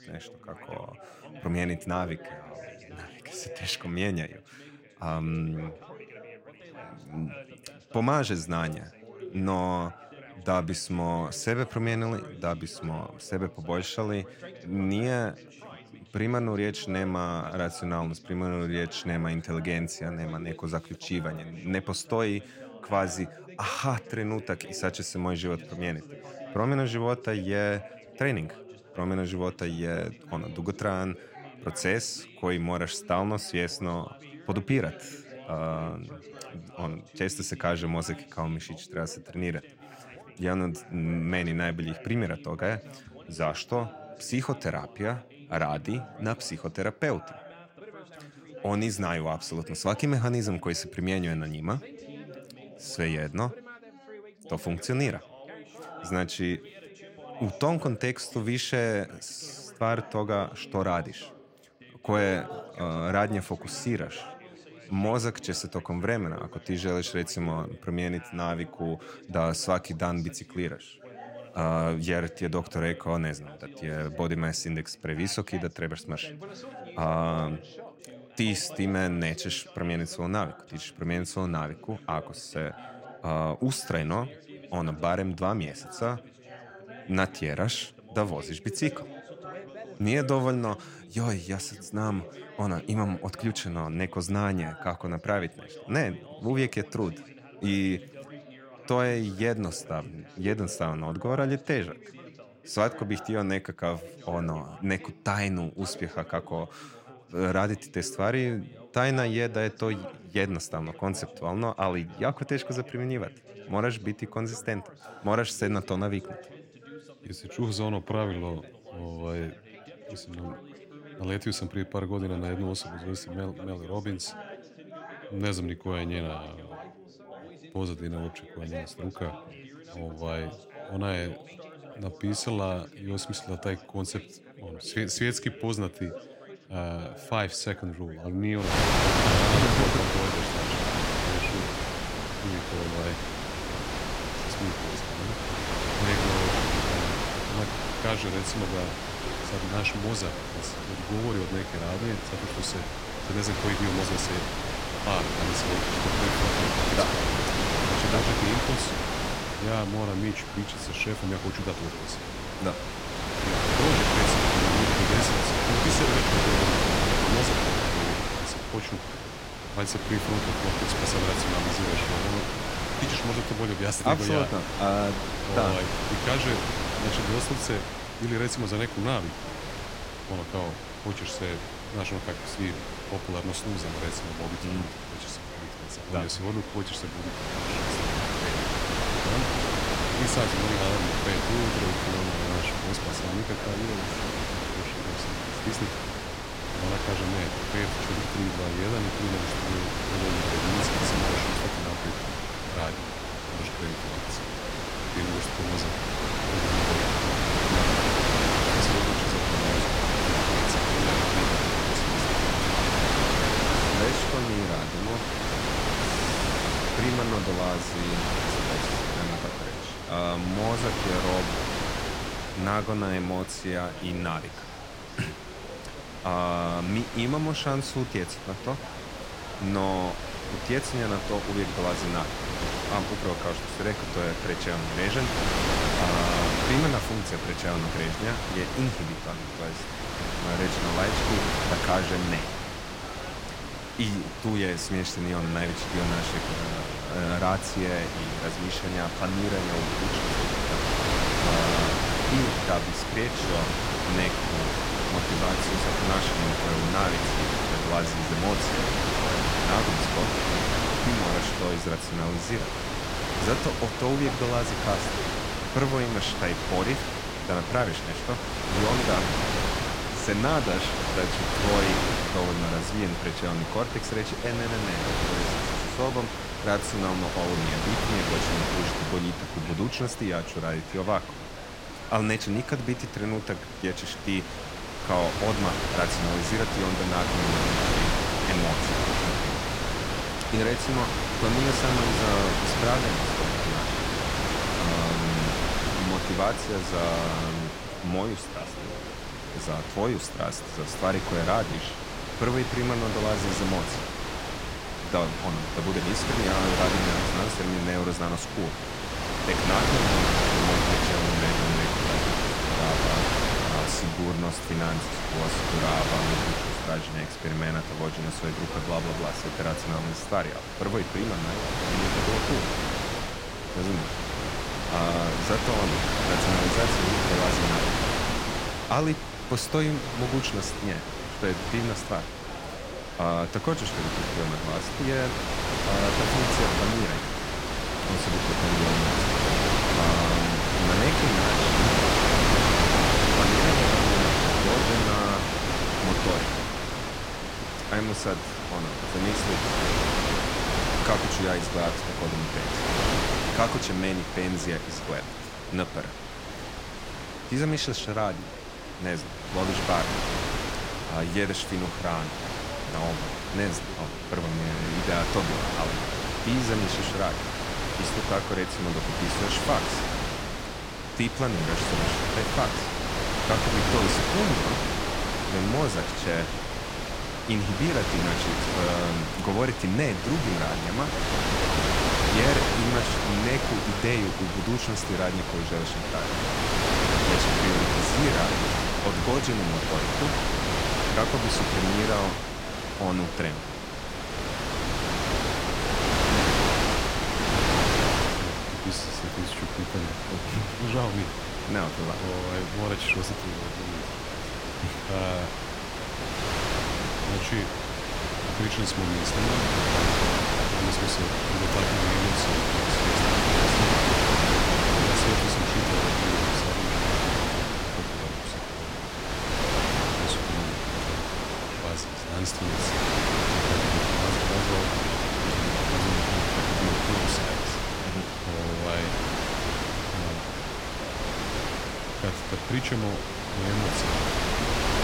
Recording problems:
wind noise on the microphone; heavy; from 2:19 on; 4 dB above the speech
background chatter; noticeable; throughout; 3 voices, 15 dB below the speech

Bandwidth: 16 kHz